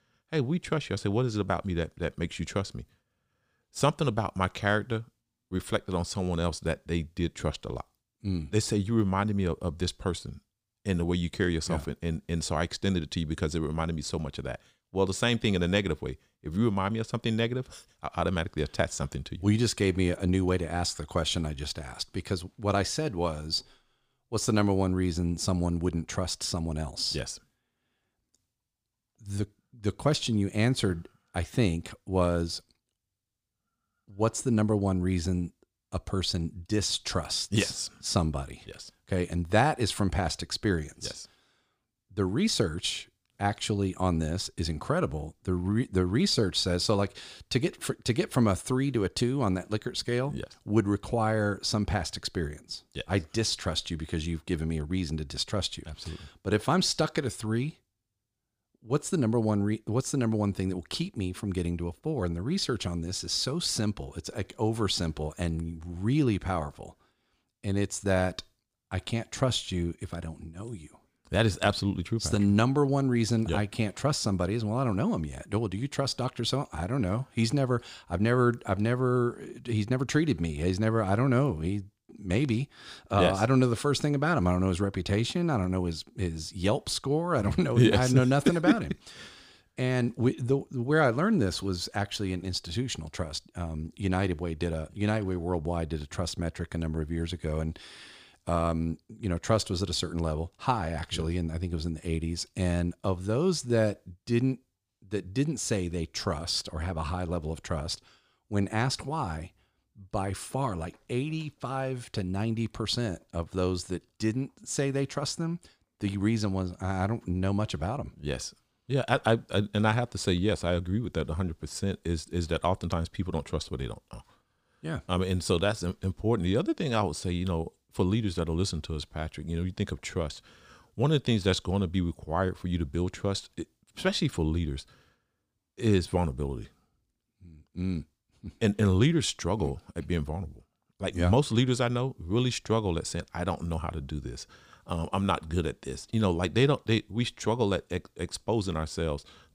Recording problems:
none

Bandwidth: 15 kHz